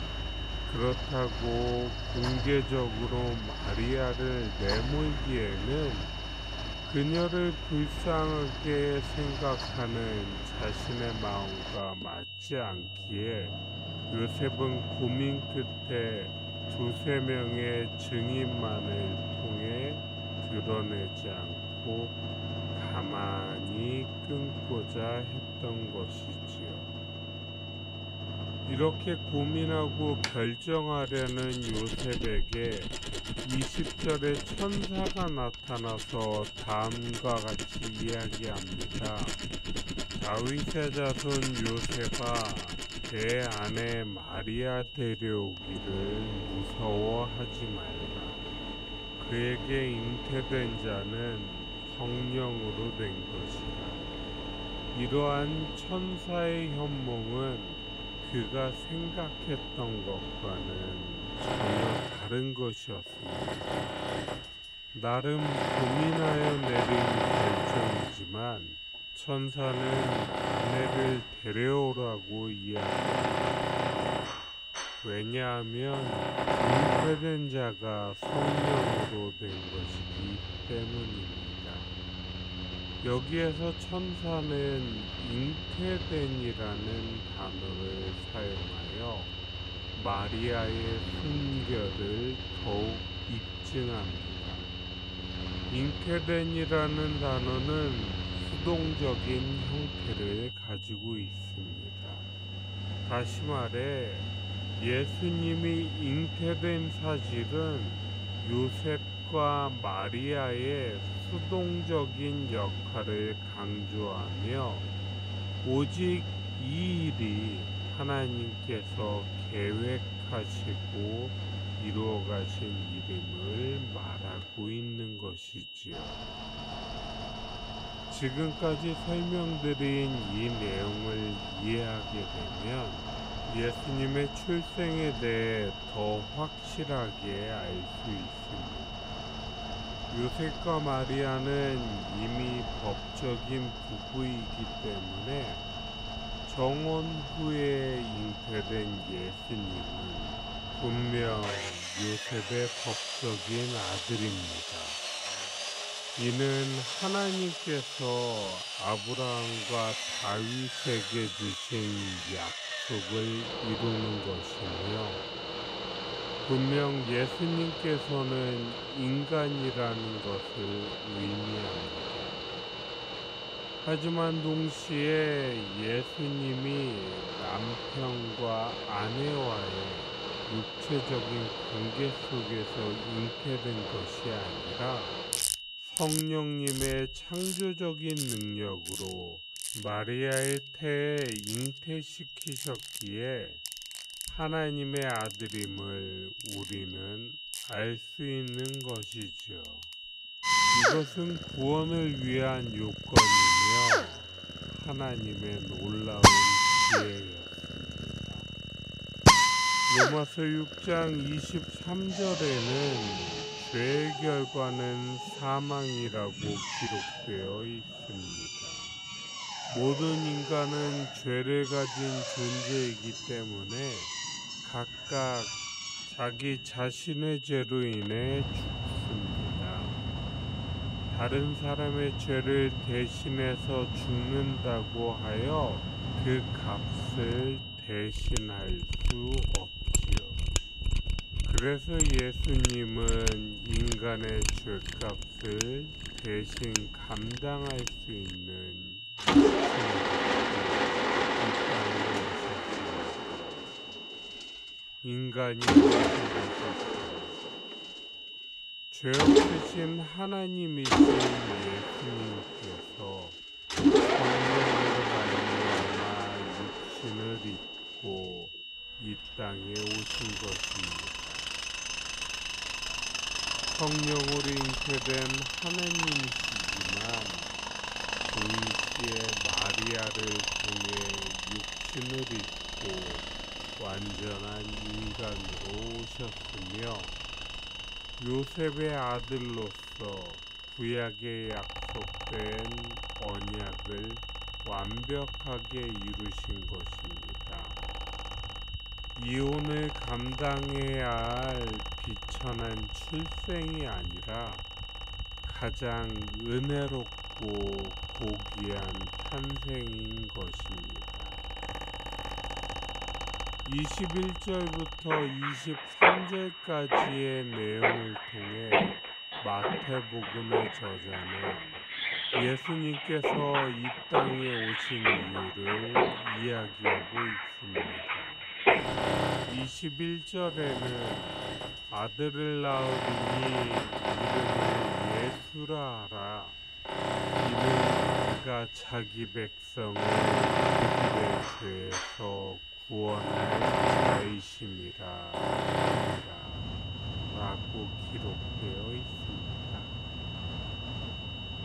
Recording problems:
wrong speed, natural pitch; too slow; 0.5 times normal speed
machinery noise; very loud; throughout; 1 dB above the speech
high-pitched whine; loud; throughout; 3 kHz, 6 dB below the speech

